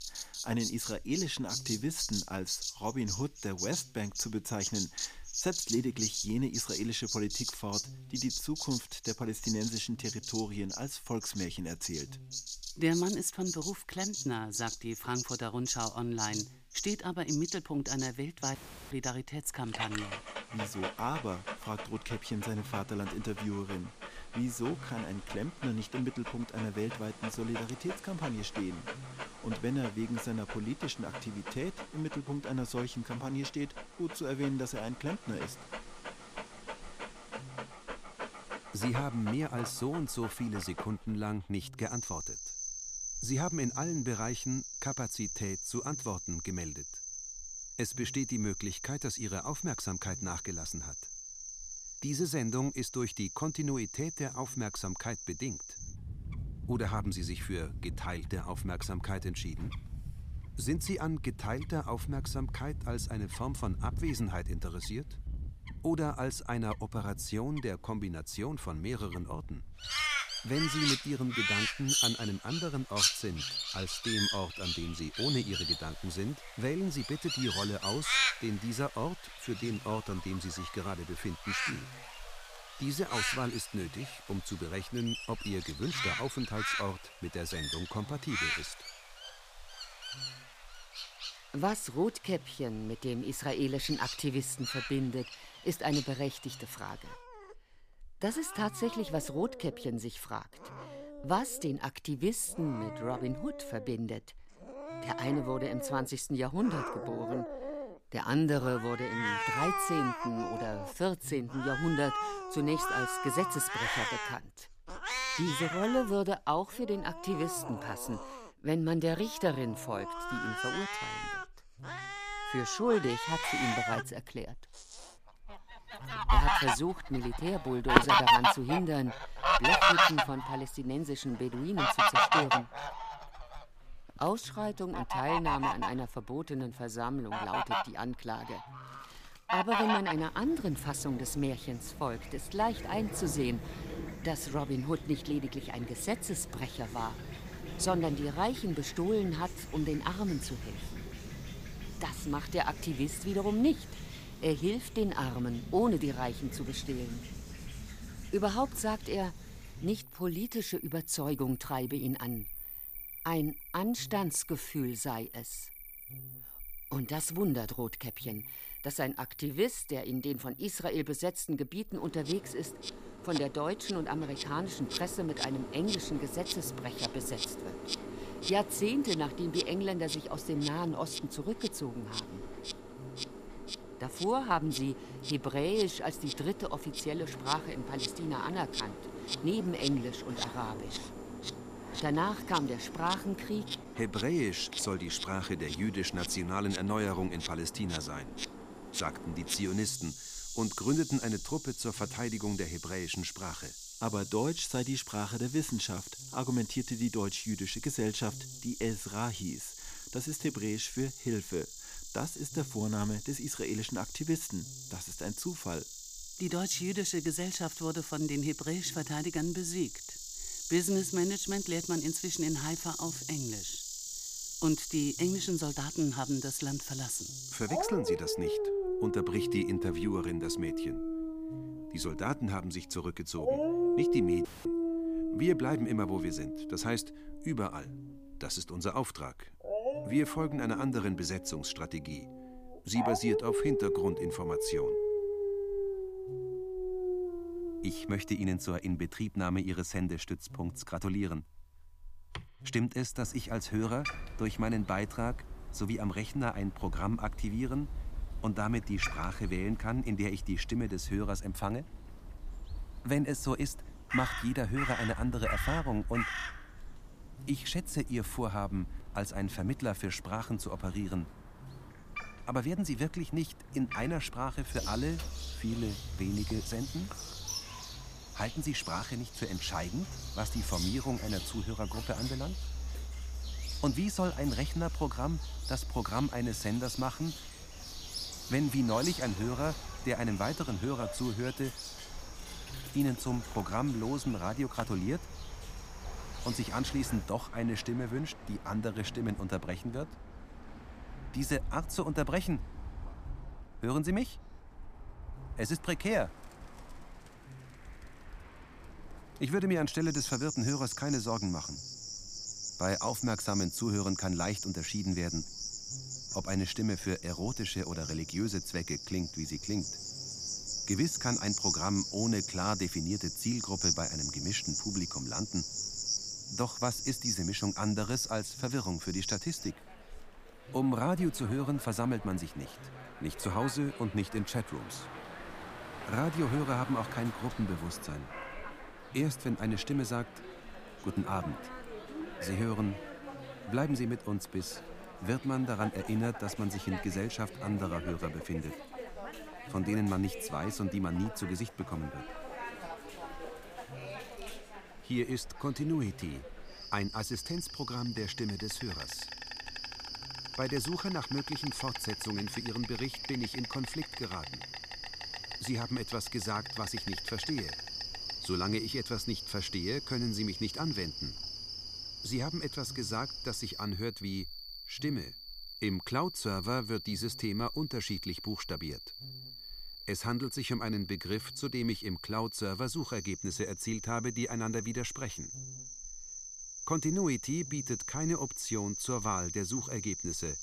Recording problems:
animal sounds; loud; throughout; 3 dB below the speech
electrical hum; faint; throughout; 50 Hz, 25 dB below the speech
audio cutting out; at 19 s and at 3:54

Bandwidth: 15 kHz